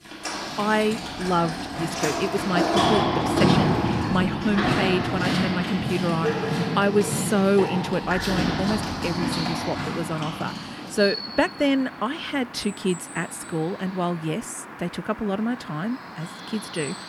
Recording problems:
animal sounds; very loud; throughout; as loud as the speech

